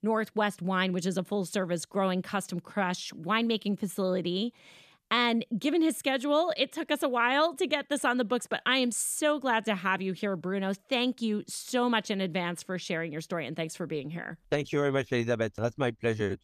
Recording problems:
none

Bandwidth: 14.5 kHz